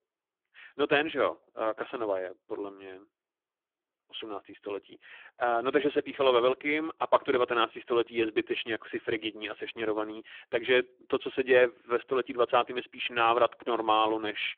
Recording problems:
phone-call audio; poor line; nothing above 3.5 kHz

